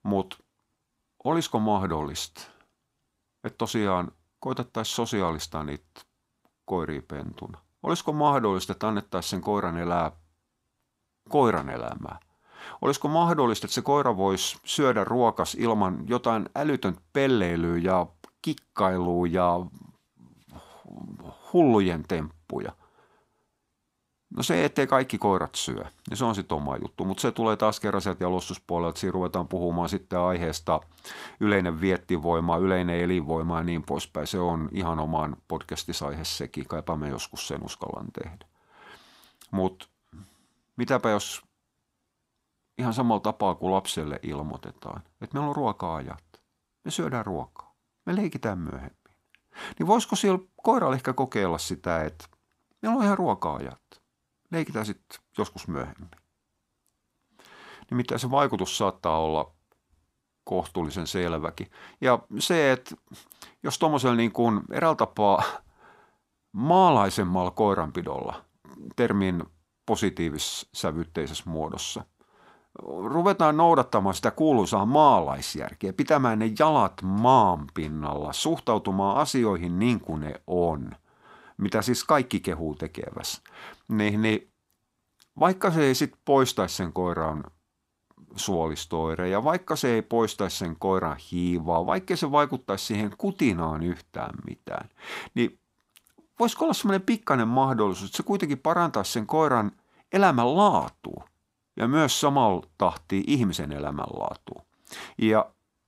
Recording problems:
none

